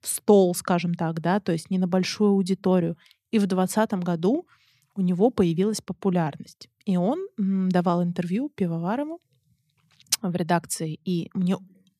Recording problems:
none

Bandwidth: 14.5 kHz